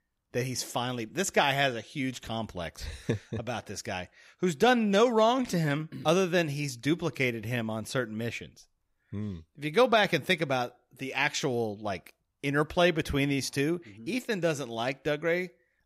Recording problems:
none

